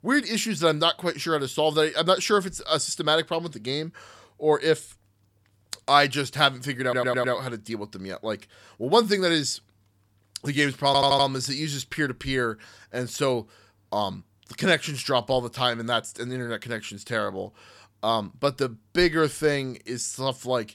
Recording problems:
audio stuttering; at 7 s and at 11 s

